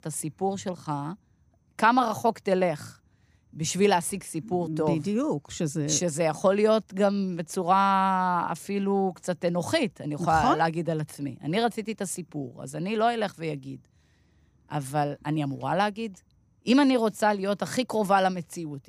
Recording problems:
none

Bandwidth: 15 kHz